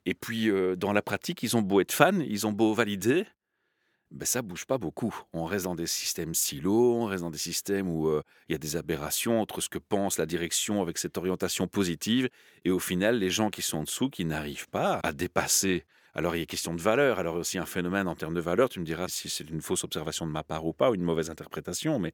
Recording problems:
none

